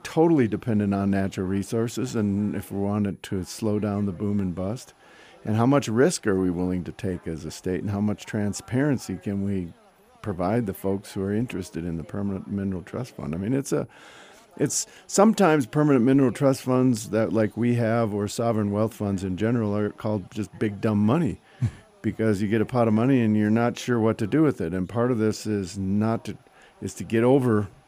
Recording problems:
background chatter; faint; throughout; 2 voices, 30 dB below the speech

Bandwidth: 15 kHz